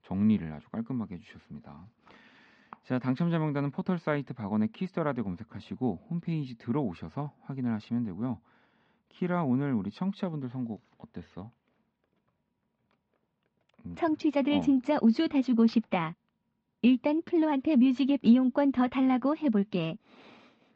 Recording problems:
muffled; slightly; fading above 3.5 kHz

